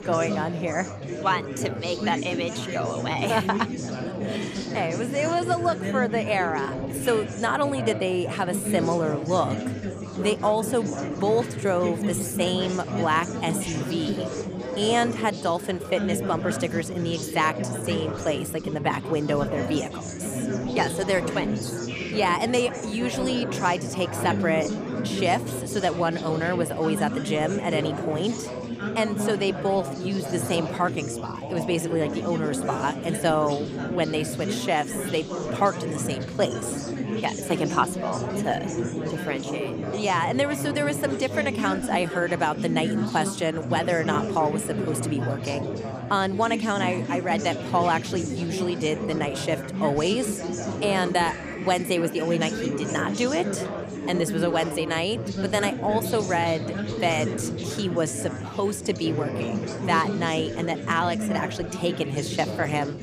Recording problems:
chatter from many people; loud; throughout; 4 dB below the speech

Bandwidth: 14.5 kHz